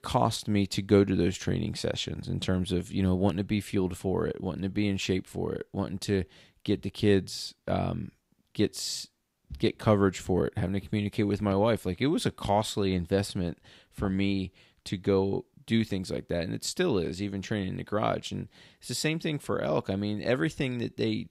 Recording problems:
none

